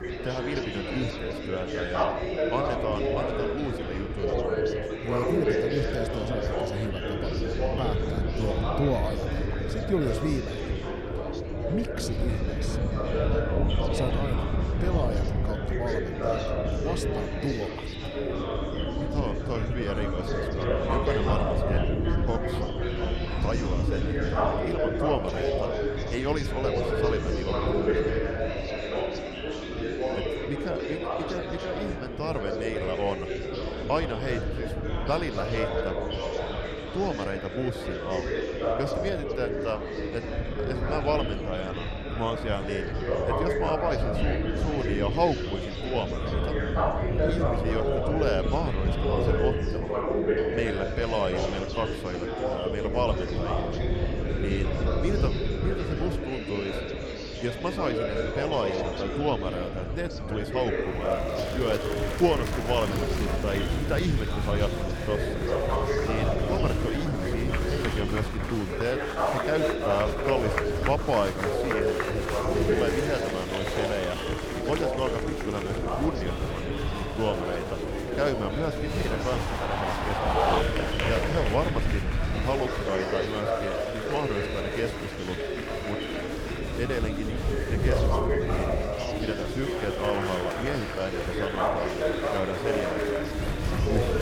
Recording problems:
murmuring crowd; very loud; throughout; 2 dB above the speech
wind noise on the microphone; occasional gusts; 15 dB below the speech

